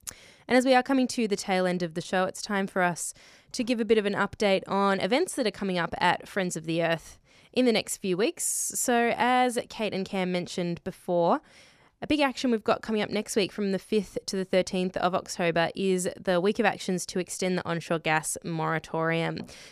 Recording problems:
none

